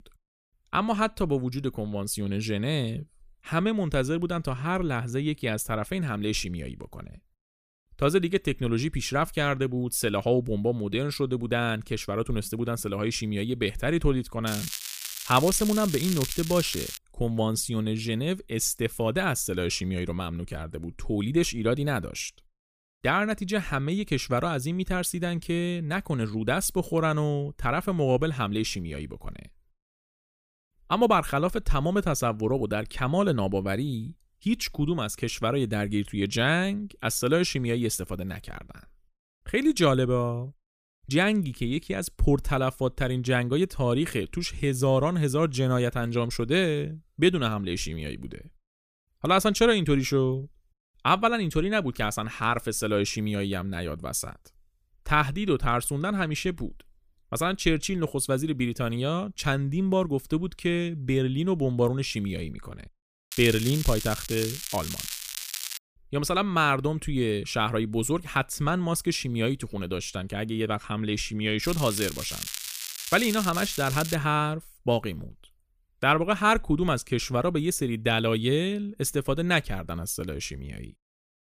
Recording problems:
crackling; loud; from 14 to 17 s, from 1:03 to 1:06 and from 1:12 to 1:14; 7 dB below the speech

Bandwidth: 15 kHz